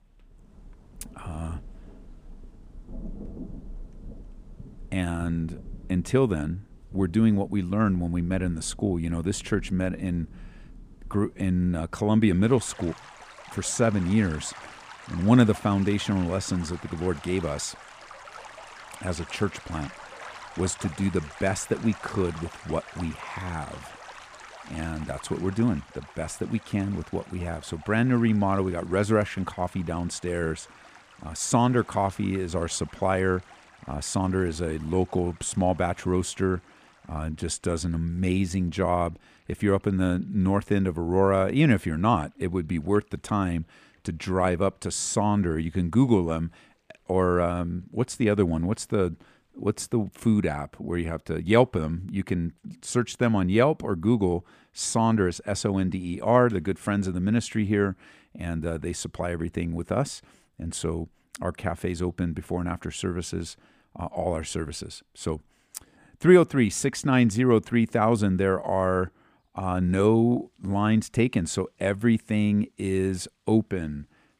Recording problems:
rain or running water; noticeable; throughout; 20 dB below the speech

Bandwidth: 15 kHz